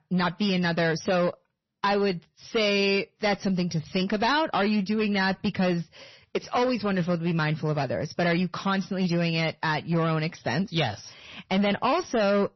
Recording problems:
distortion; slight; 13% of the sound clipped
garbled, watery; slightly; nothing above 6 kHz

